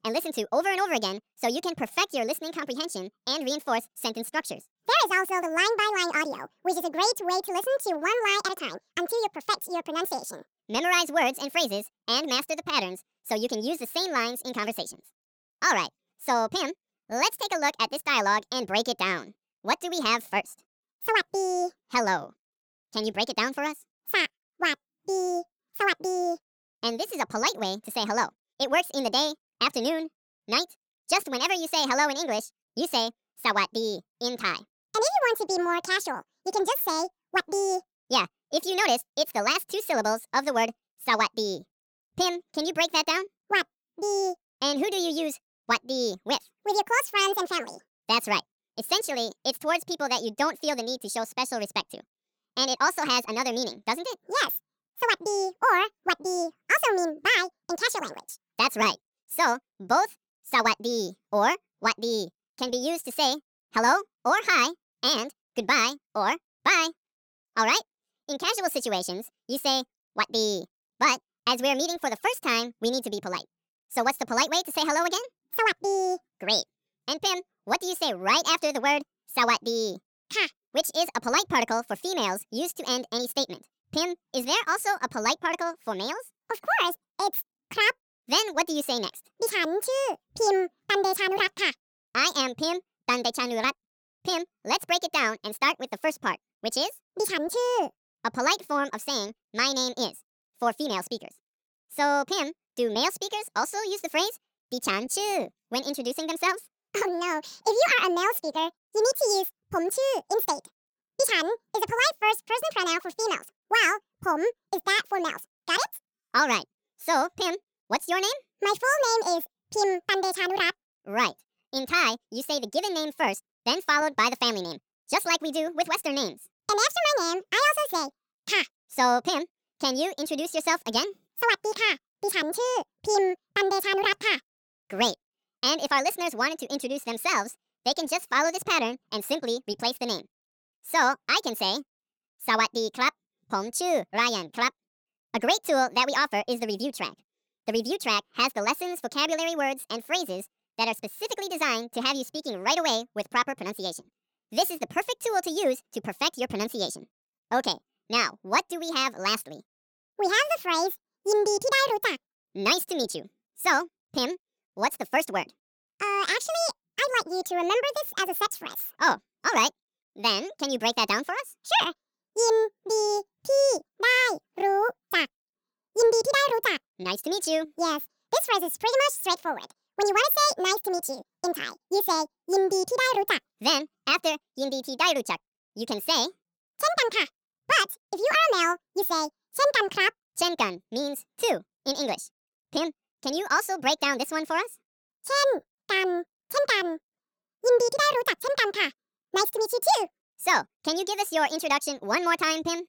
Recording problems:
wrong speed and pitch; too fast and too high; 1.6 times normal speed

